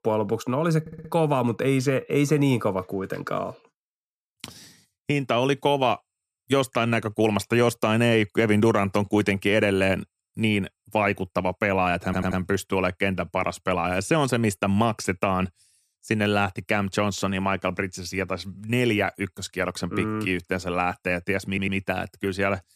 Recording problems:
audio stuttering; at 1 s, at 12 s and at 21 s

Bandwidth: 14.5 kHz